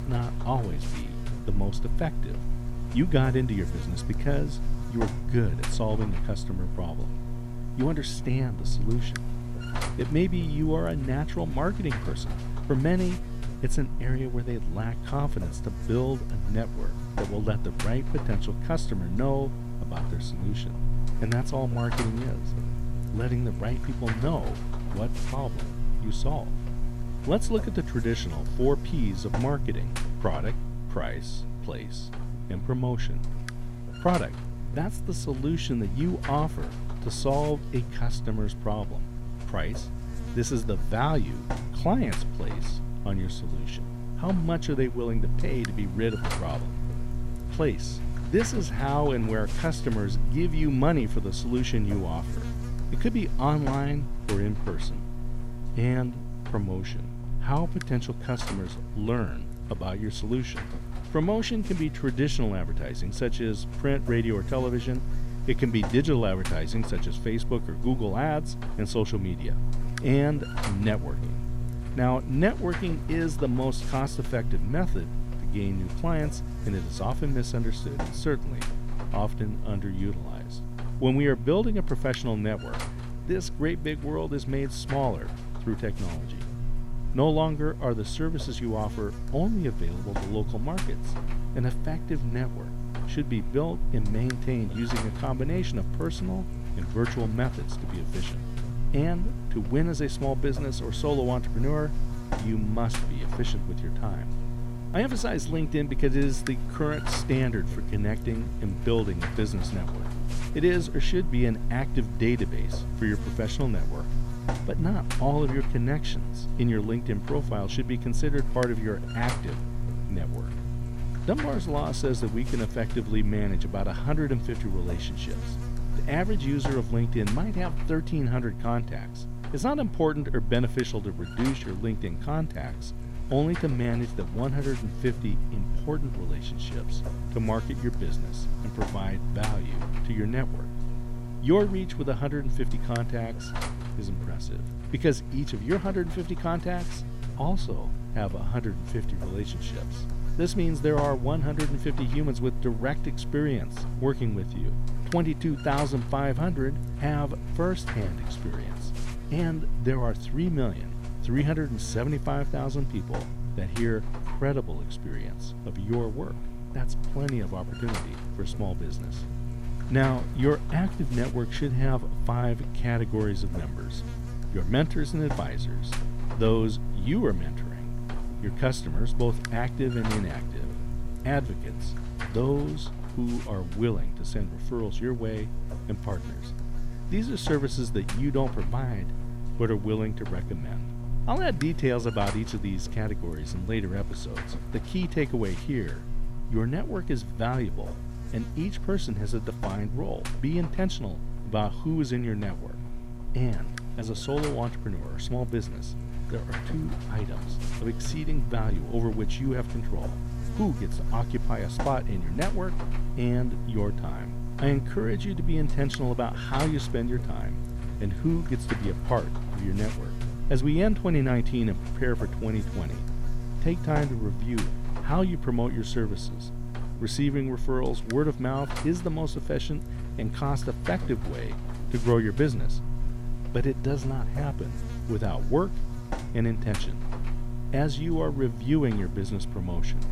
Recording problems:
electrical hum; loud; throughout; 60 Hz, 9 dB below the speech

